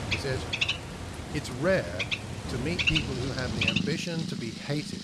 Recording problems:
animal sounds; very loud; throughout; 2 dB above the speech
rain or running water; loud; throughout; 10 dB below the speech

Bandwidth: 14 kHz